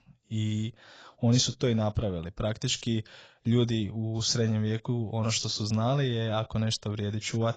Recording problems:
garbled, watery; badly; nothing above 7.5 kHz

